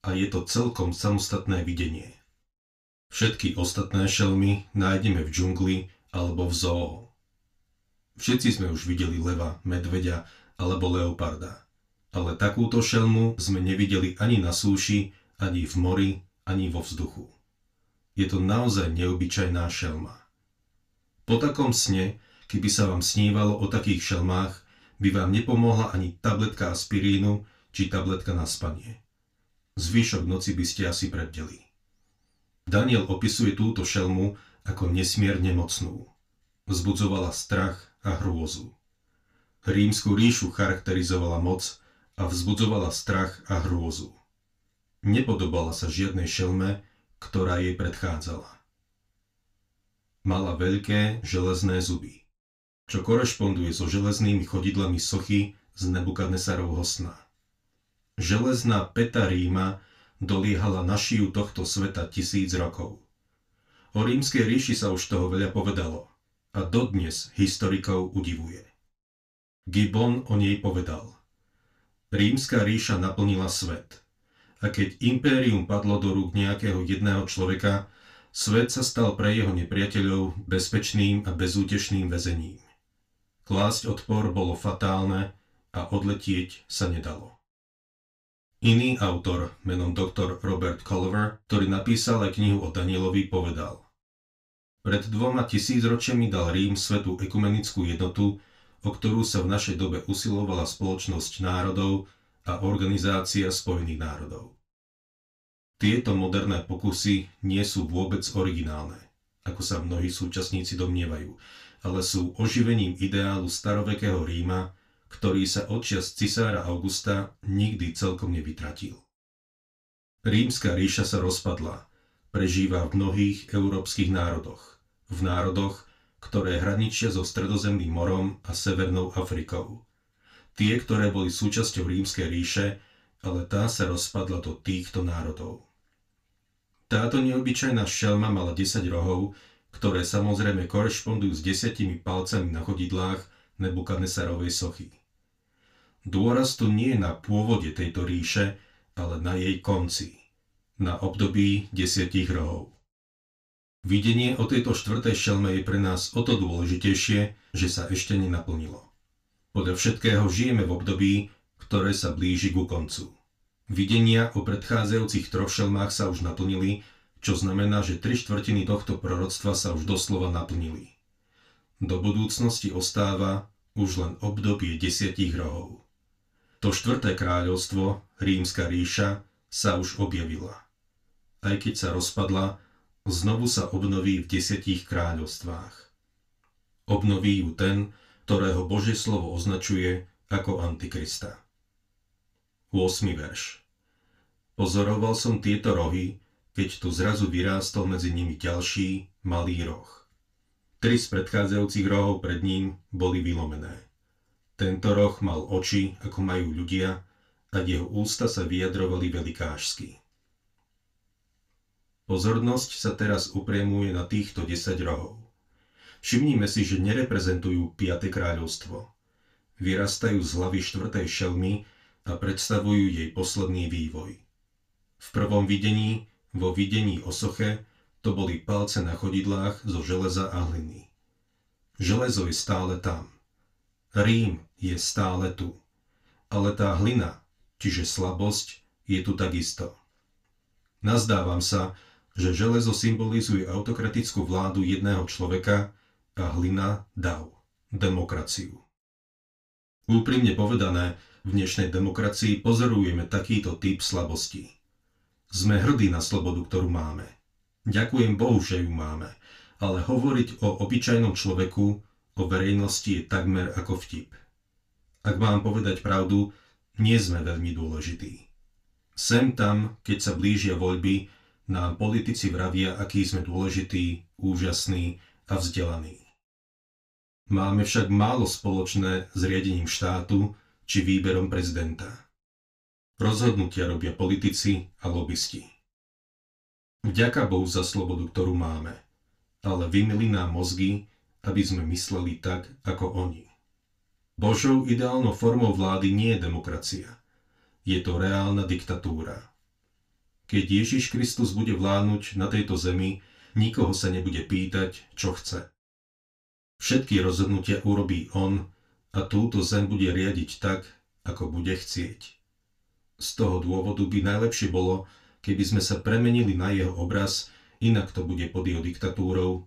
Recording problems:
off-mic speech; far
room echo; very slight; dies away in 0.2 s

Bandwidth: 15 kHz